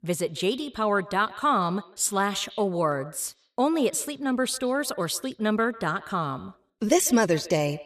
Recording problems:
echo of what is said; faint; throughout; 150 ms later, 20 dB below the speech

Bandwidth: 14.5 kHz